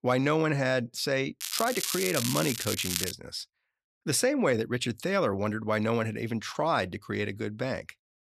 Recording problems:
crackling; loud; from 1.5 to 3 s; 2 dB below the speech

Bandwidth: 14 kHz